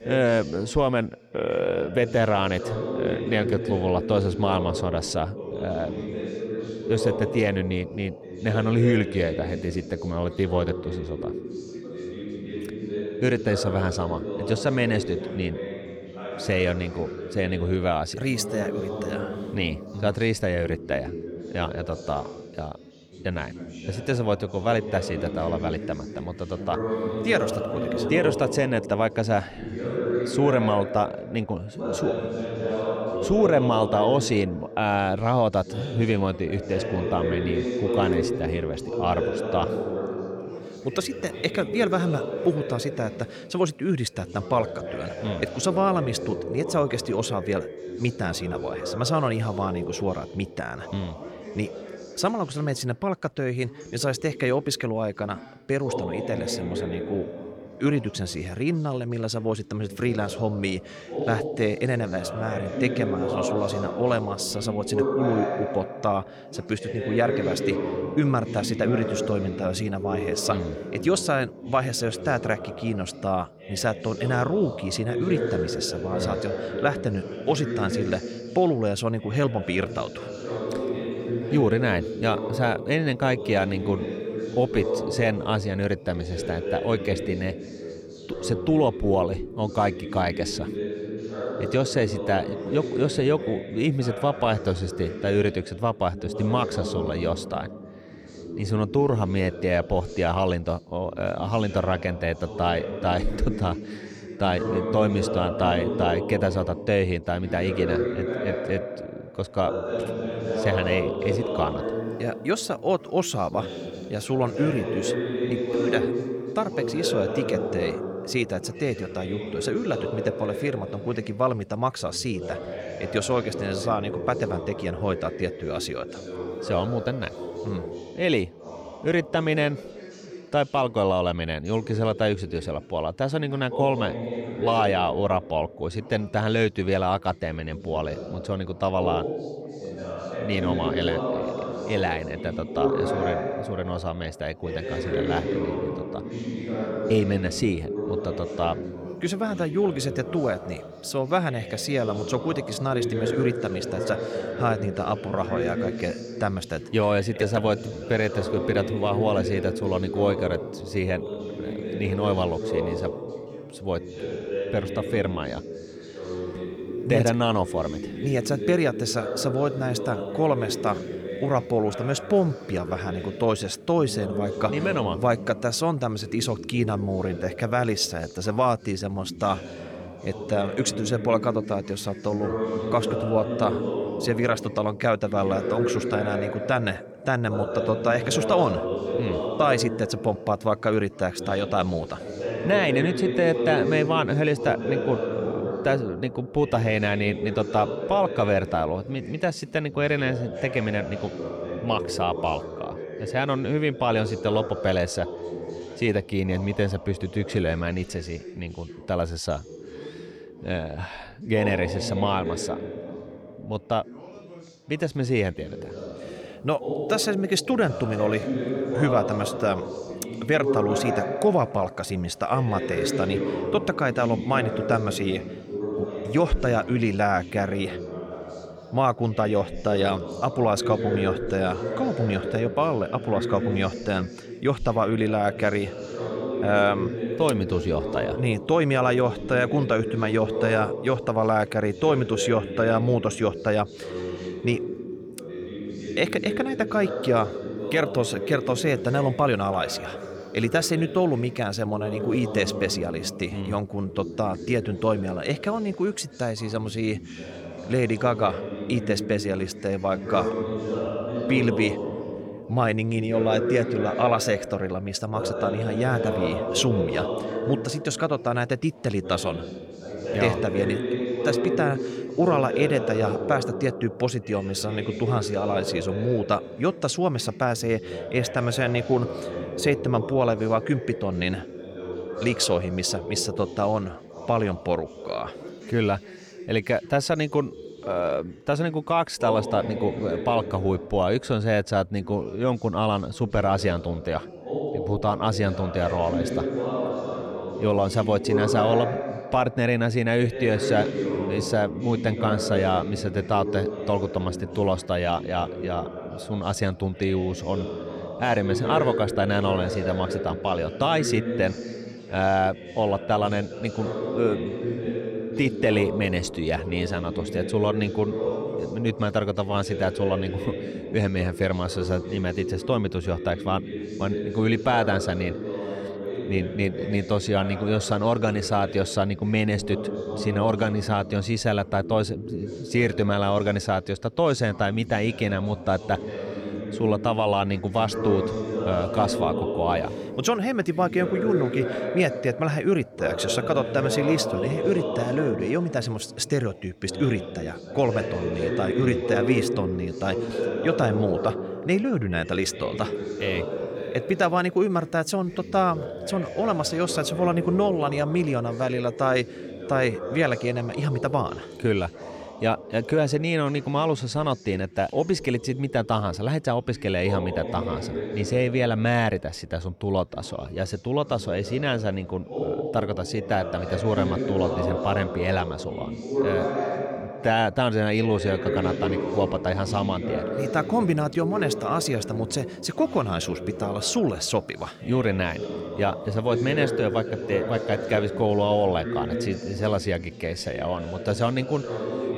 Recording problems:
background chatter; loud; throughout; 3 voices, 6 dB below the speech

